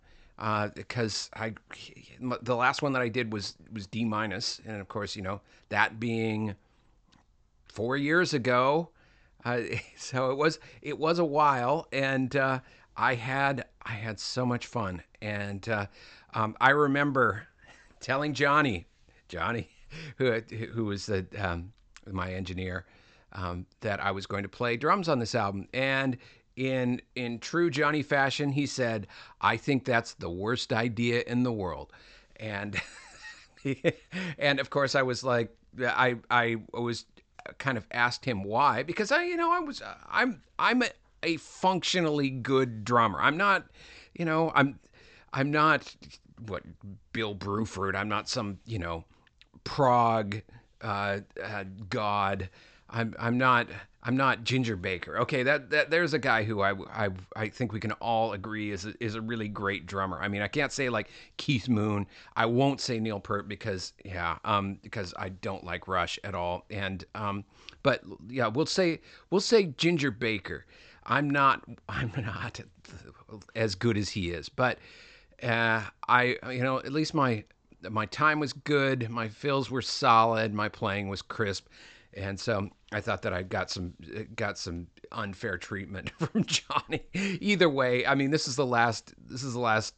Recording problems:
high frequencies cut off; noticeable; nothing above 8 kHz

